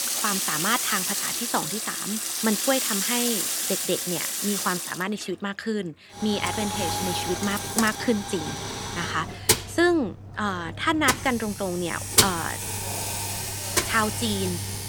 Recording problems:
household noises; very loud; throughout; 1 dB above the speech

